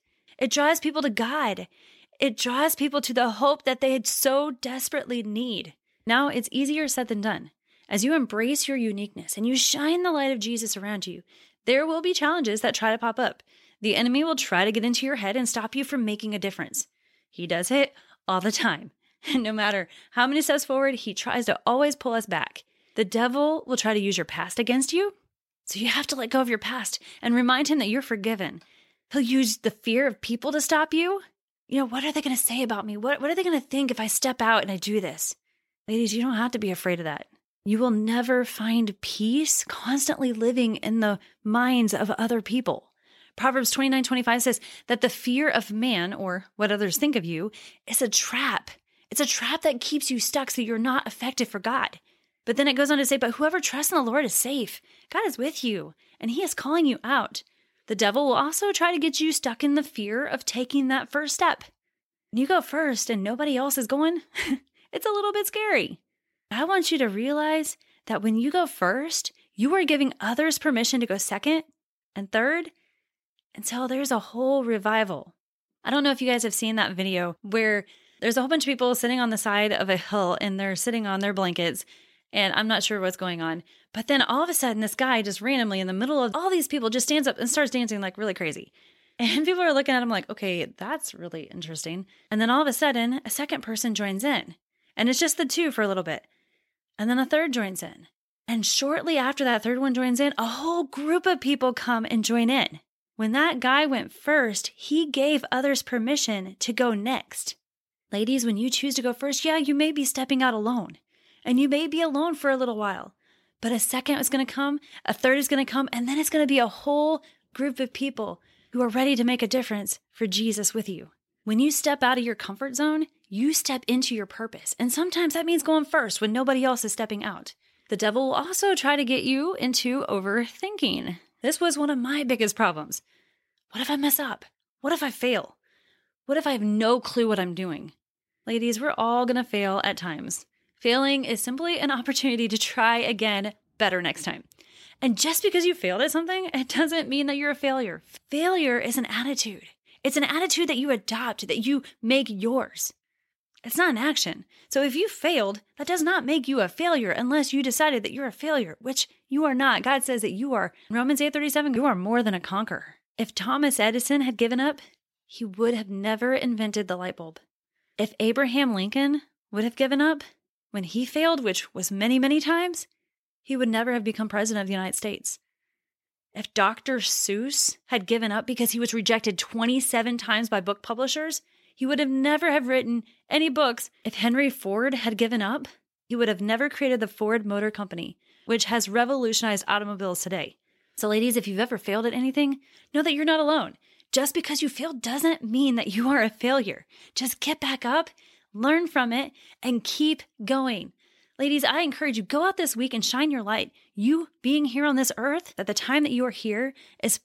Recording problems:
none

